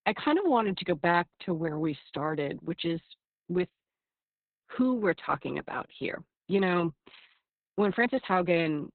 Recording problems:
garbled, watery; badly; nothing above 4 kHz

